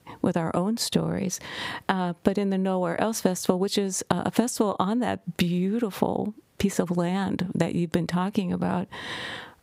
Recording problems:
squashed, flat; somewhat

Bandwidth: 15.5 kHz